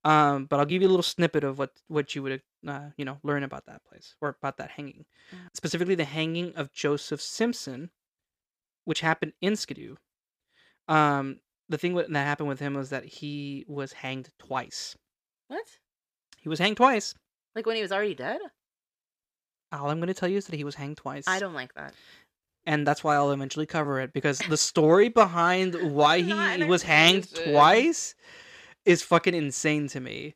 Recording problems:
uneven, jittery; slightly; from 0.5 to 29 s

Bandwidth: 15 kHz